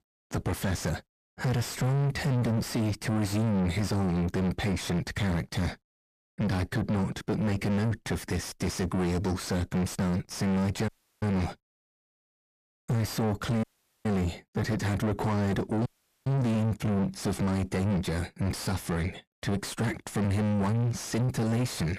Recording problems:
distortion; heavy; 7 dB below the speech
audio cutting out; at 11 s, at 14 s and at 16 s

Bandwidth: 14.5 kHz